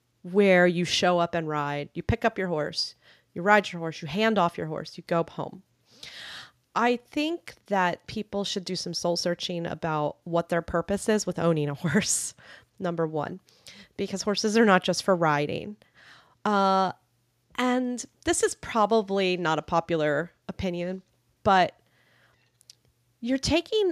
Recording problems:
abrupt cut into speech; at the end

